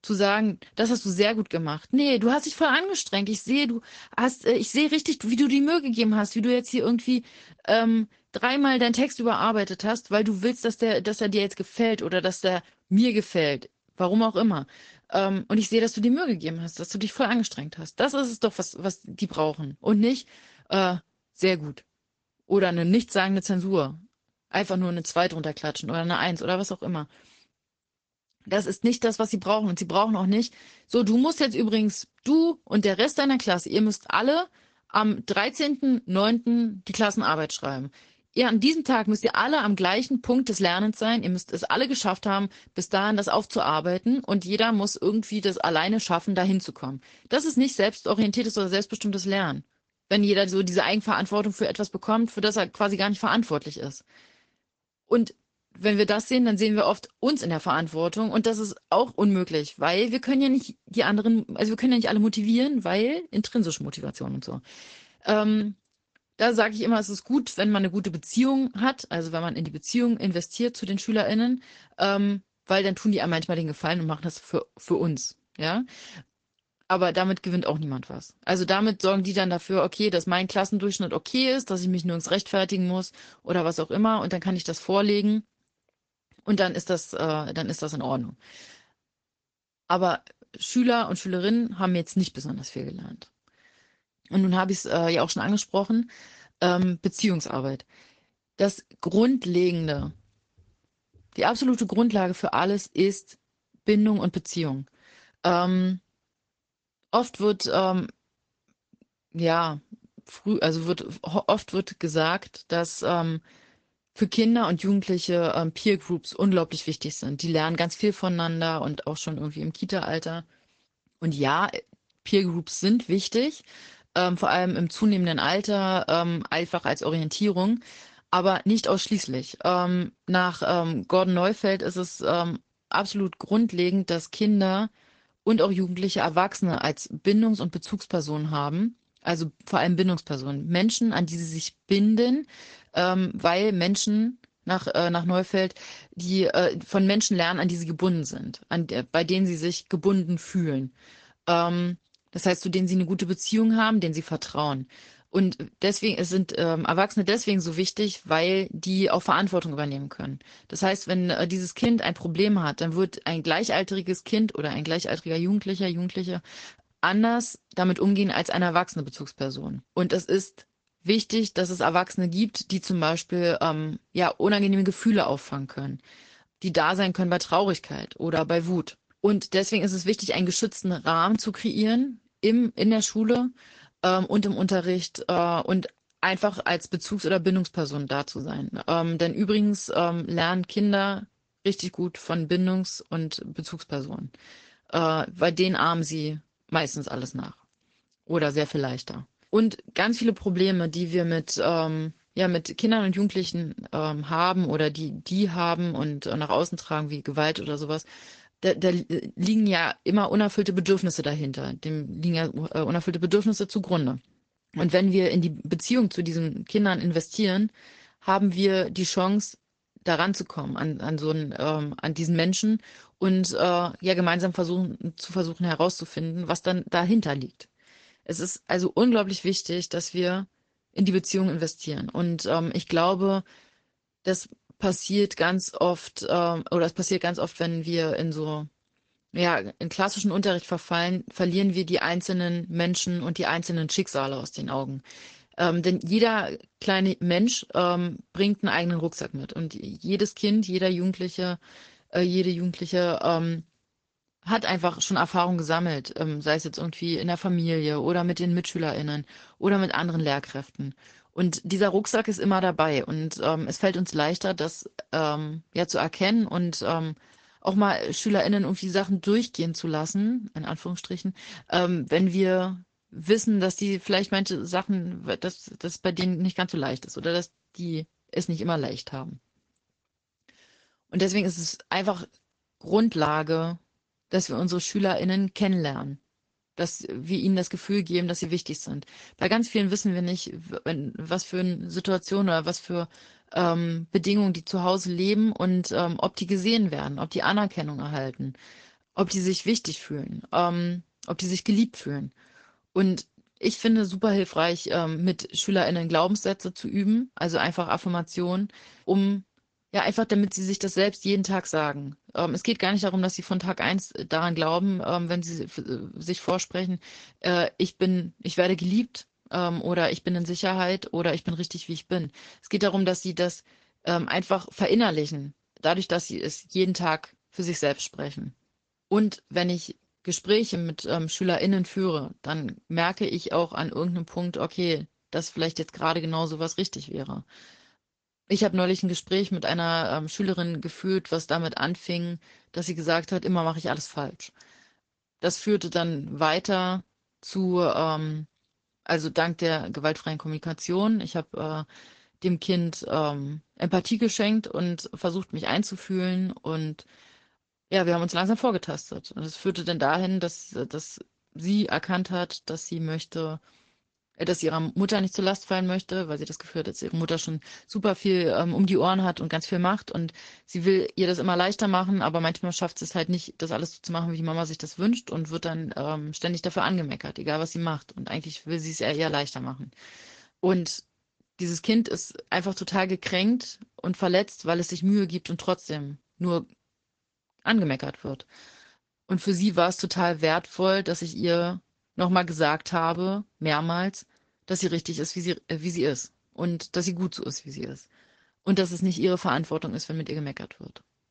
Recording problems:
high frequencies cut off; noticeable; nothing above 7.5 kHz
garbled, watery; slightly

